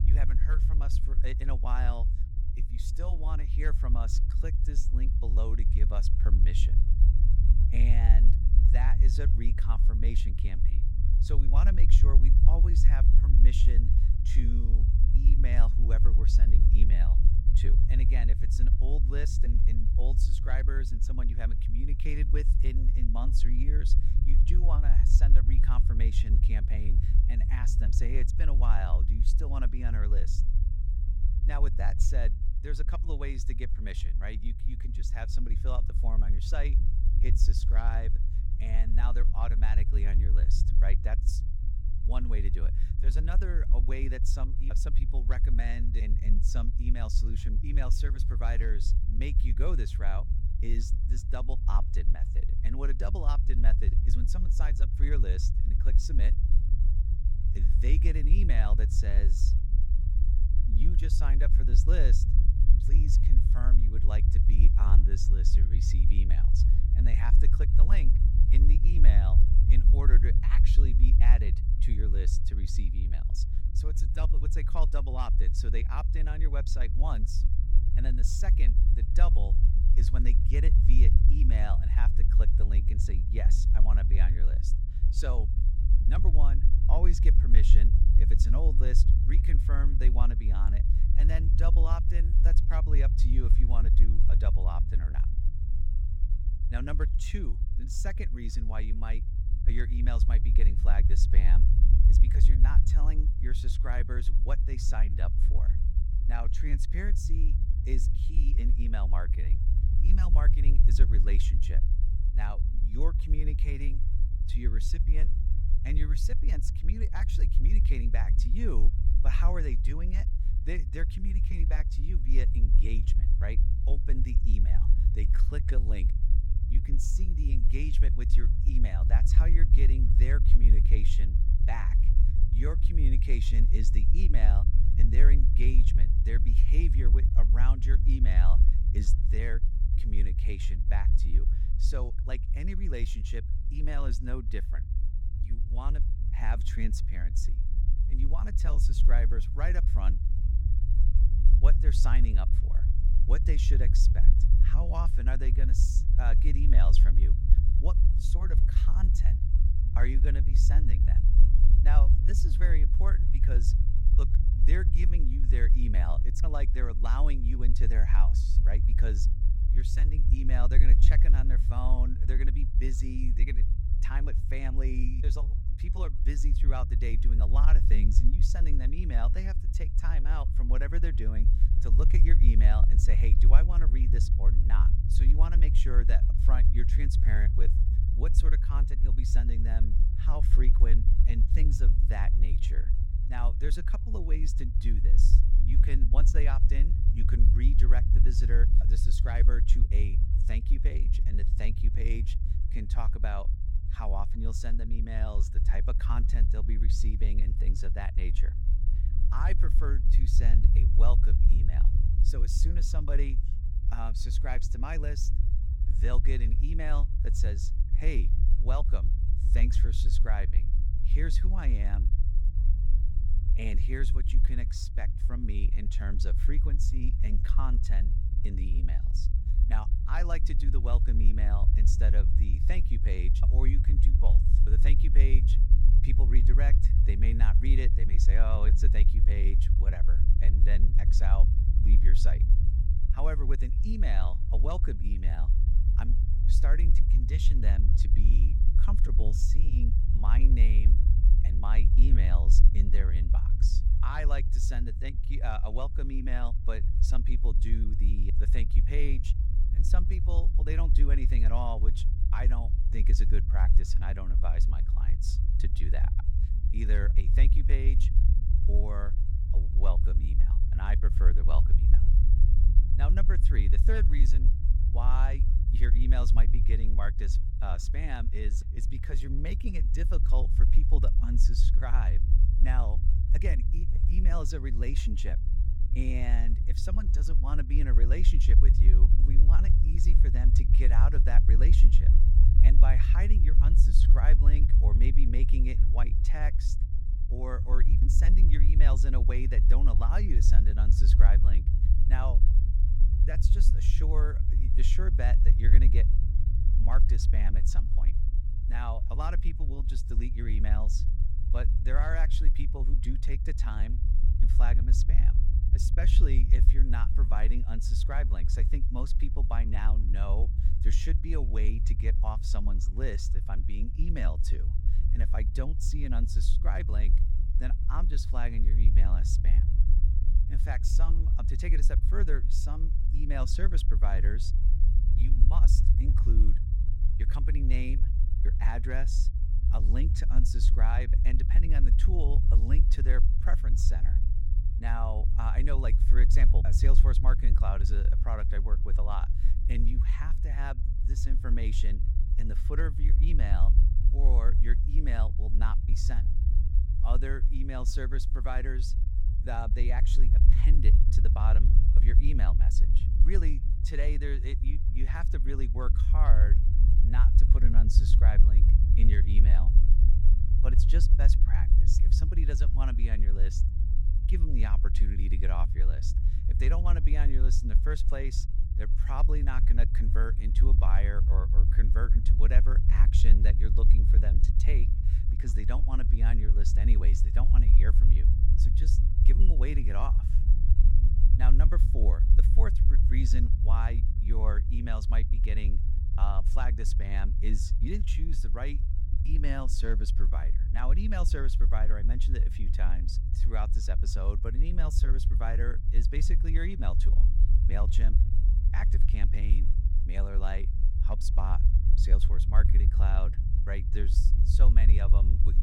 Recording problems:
low rumble; loud; throughout; 5 dB below the speech

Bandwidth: 18 kHz